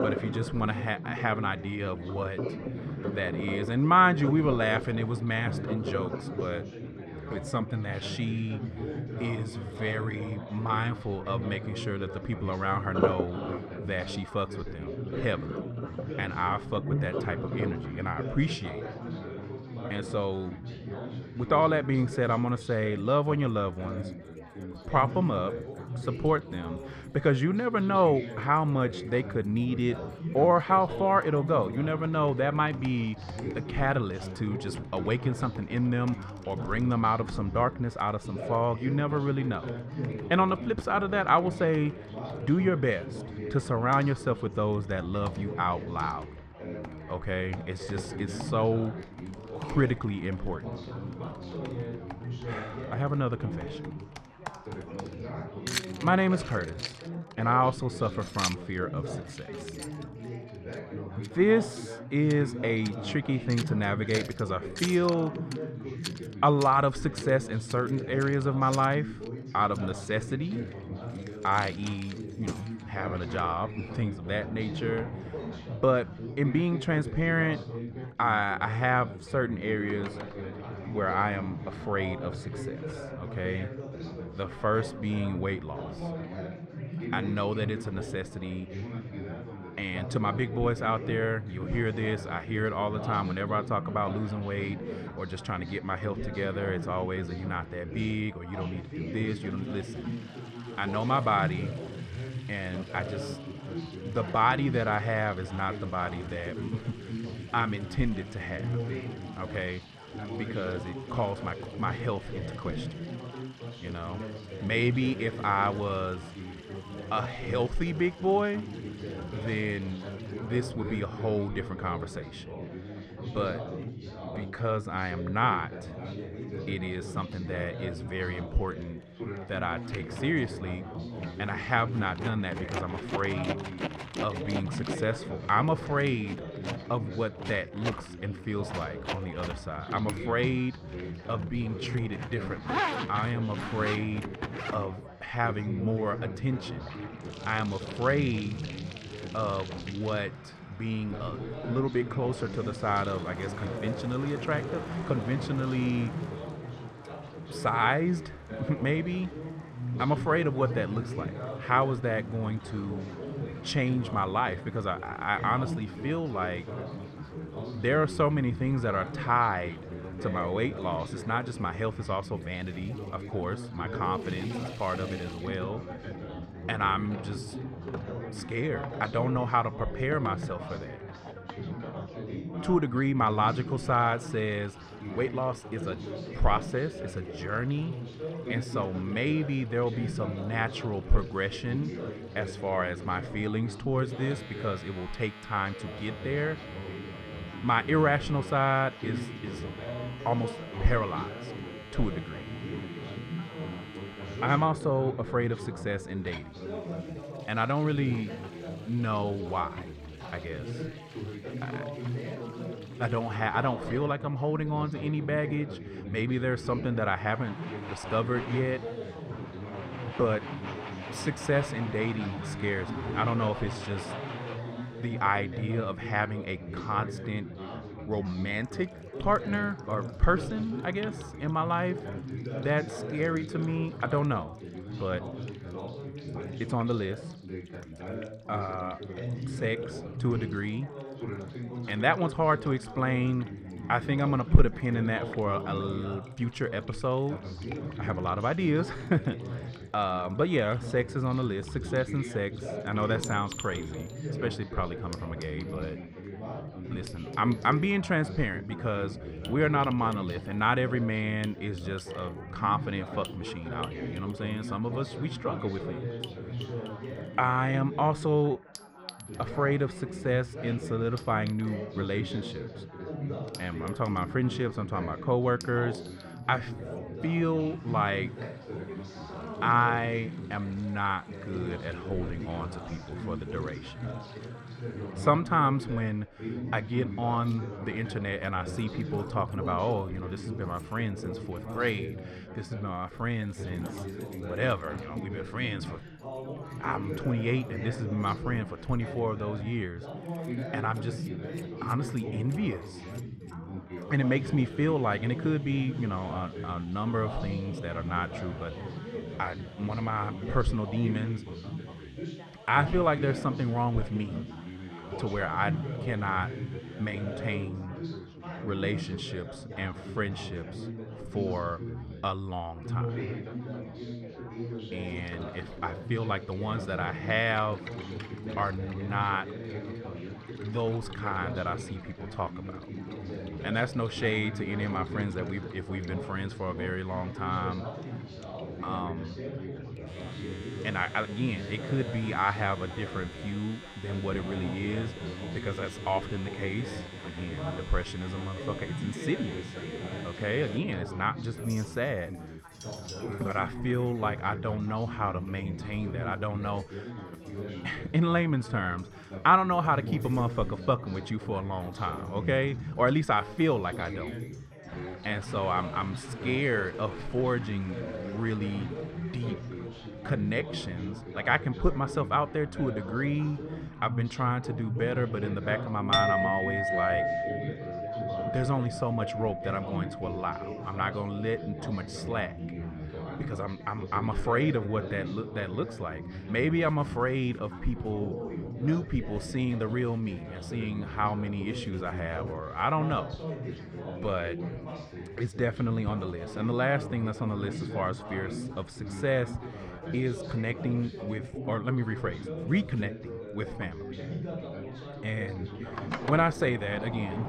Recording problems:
muffled; slightly; fading above 3.5 kHz
background chatter; loud; throughout; 4 voices, 8 dB below the speech
household noises; noticeable; throughout; 15 dB below the speech

